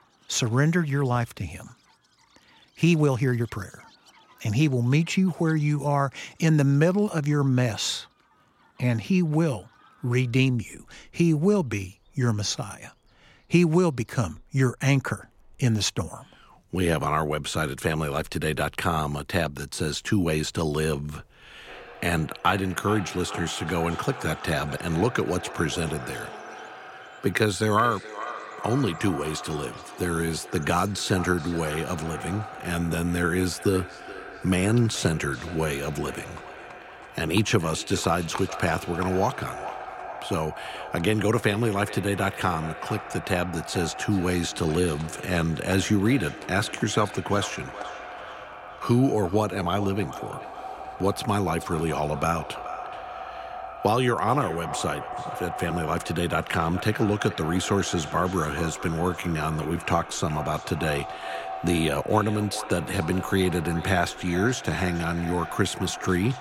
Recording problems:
echo of what is said; noticeable; from 22 s on; 430 ms later, 10 dB below the speech
animal sounds; faint; throughout; 25 dB below the speech
uneven, jittery; strongly; from 2.5 s to 1:00

